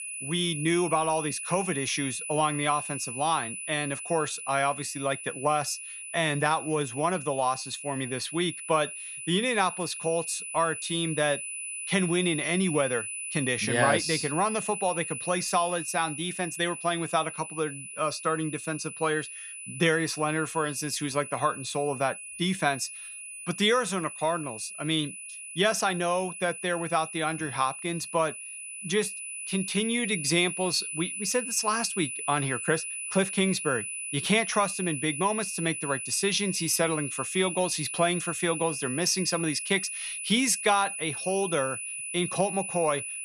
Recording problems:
high-pitched whine; loud; throughout; 10 kHz, 6 dB below the speech

